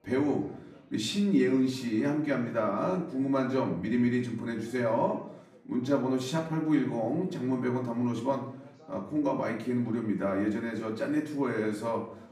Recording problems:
off-mic speech; far
room echo; slight; dies away in 0.6 s
background chatter; faint; throughout; 4 voices, 30 dB below the speech

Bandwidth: 15 kHz